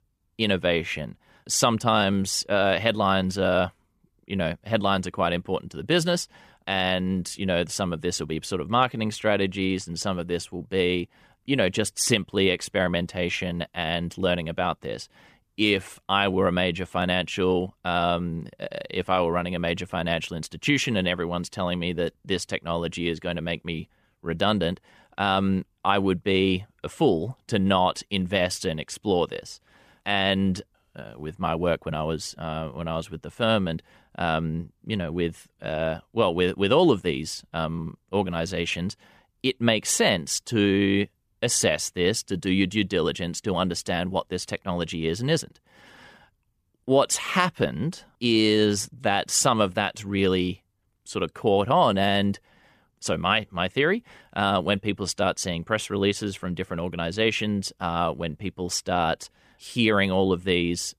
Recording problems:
none

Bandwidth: 14.5 kHz